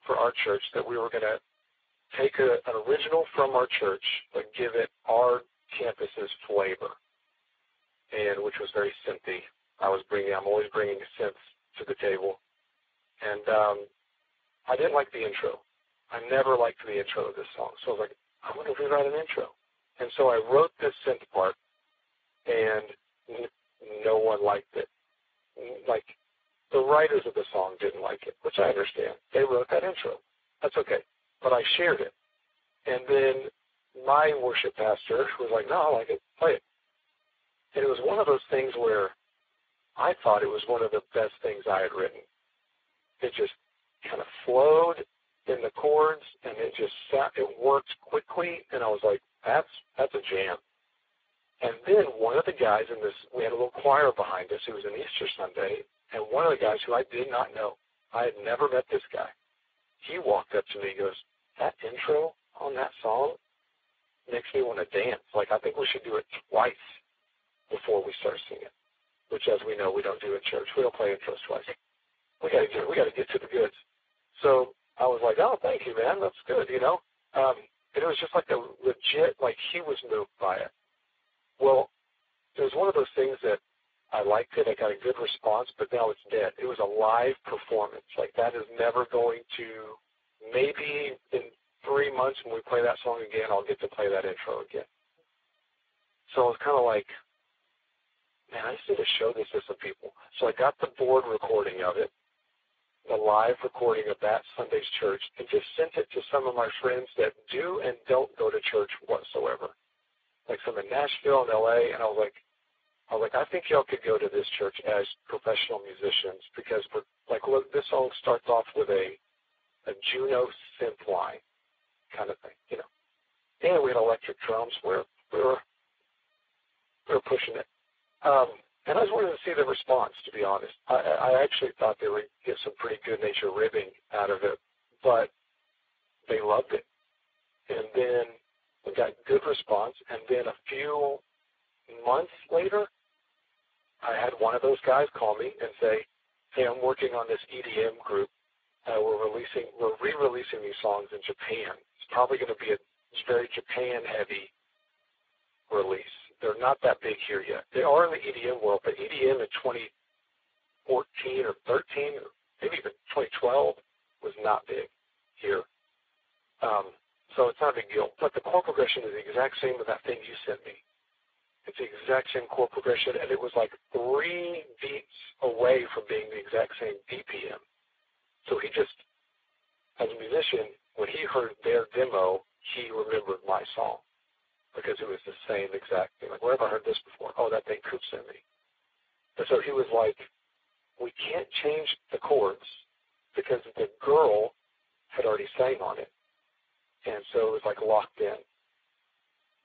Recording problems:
phone-call audio; poor line
garbled, watery; badly

